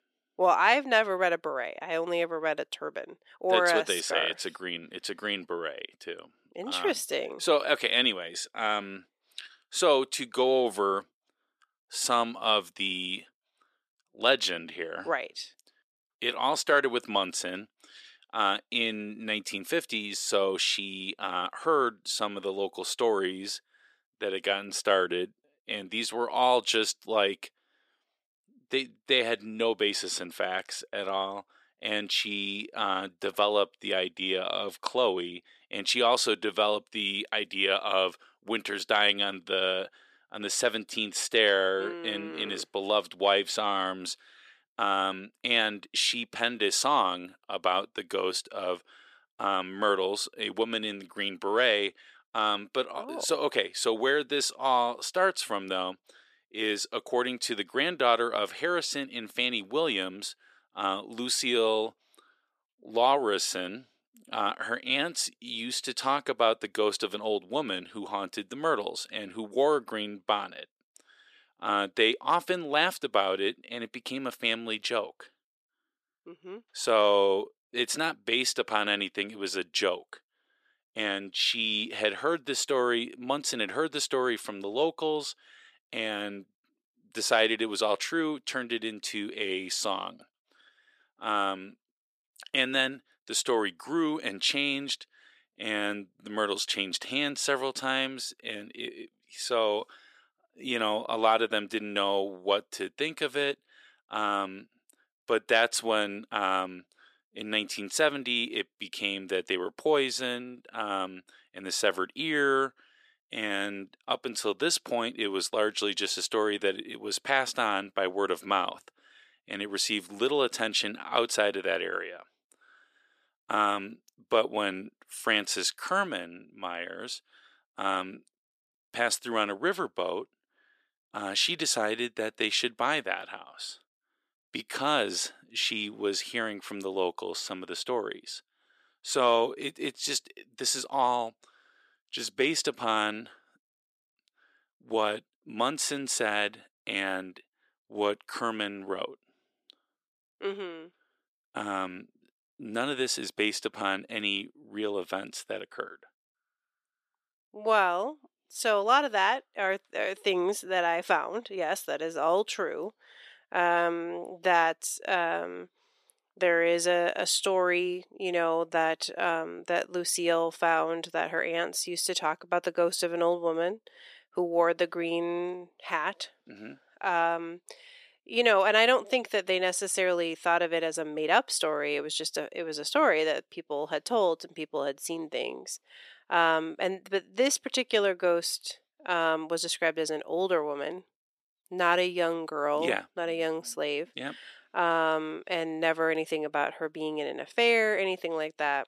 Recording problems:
thin; very; fading below 350 Hz

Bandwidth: 14.5 kHz